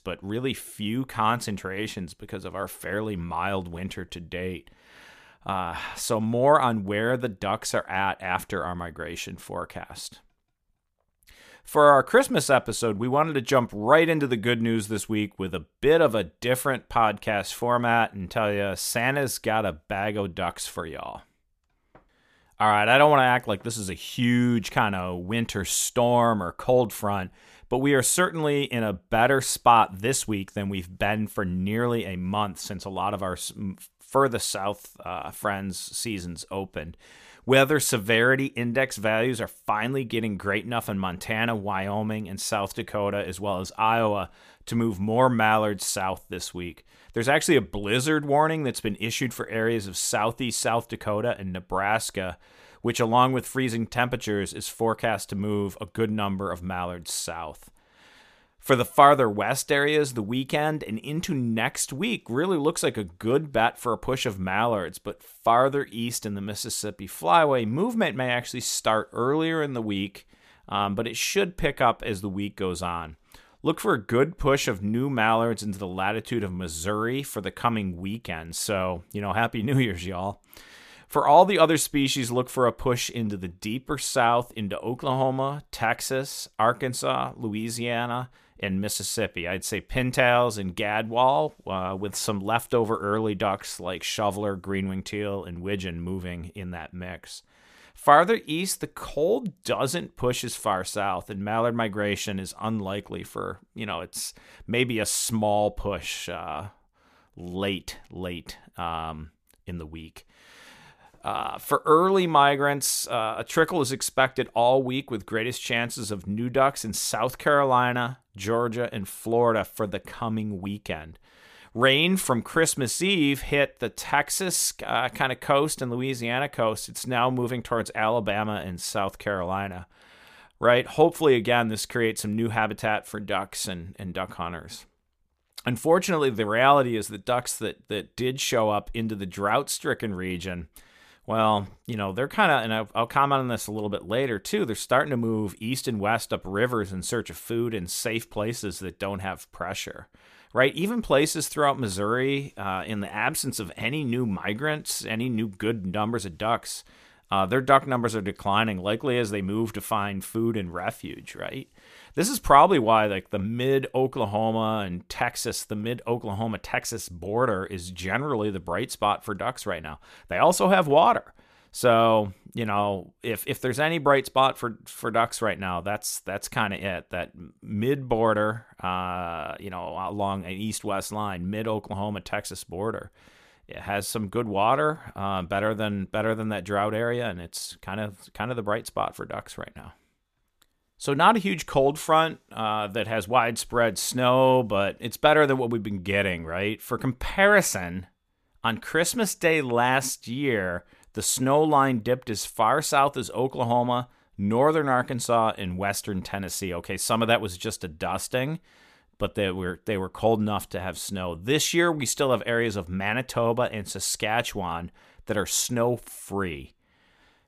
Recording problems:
none

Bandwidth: 14.5 kHz